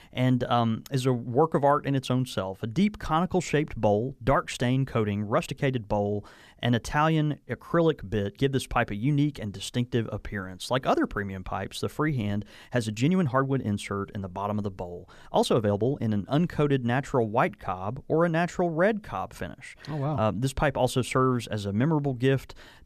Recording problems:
uneven, jittery; strongly; from 4 to 20 s

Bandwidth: 14.5 kHz